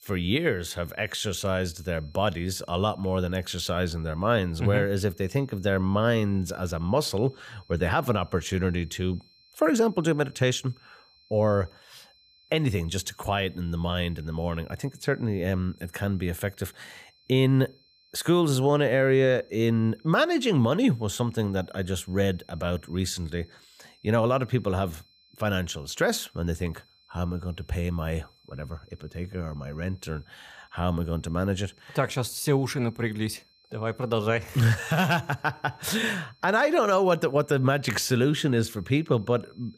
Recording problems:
high-pitched whine; faint; throughout; 4 kHz, 30 dB below the speech

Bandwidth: 15 kHz